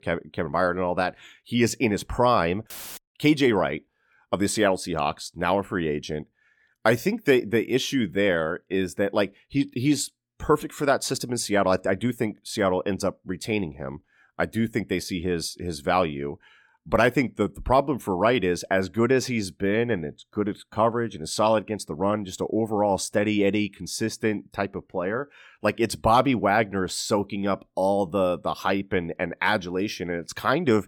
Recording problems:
none

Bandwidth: 18 kHz